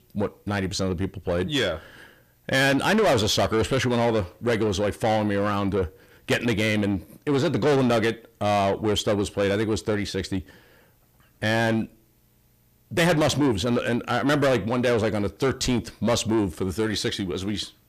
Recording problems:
distortion; heavy; 6 dB below the speech

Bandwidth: 14.5 kHz